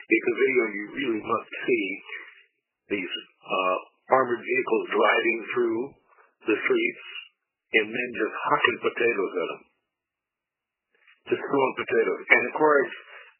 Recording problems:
garbled, watery; badly; nothing above 3 kHz
thin; very; fading below 350 Hz

